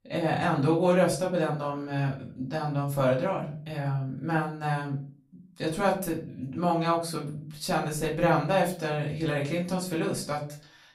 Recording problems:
off-mic speech; far
room echo; slight; dies away in 0.4 s

